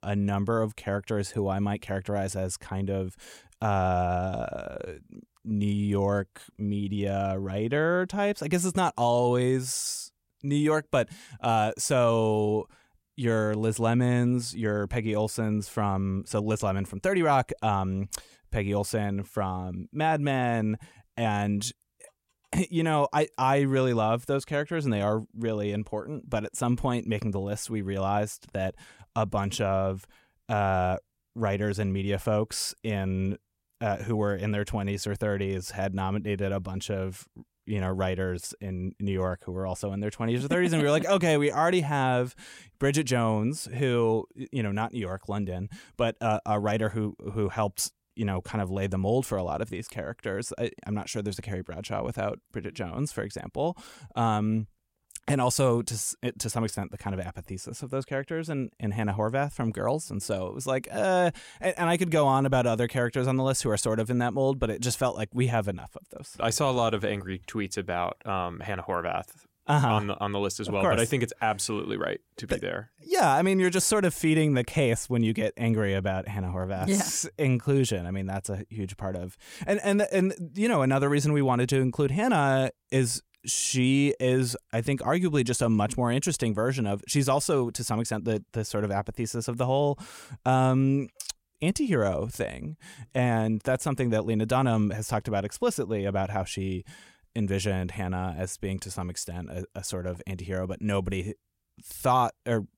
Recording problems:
none

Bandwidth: 16.5 kHz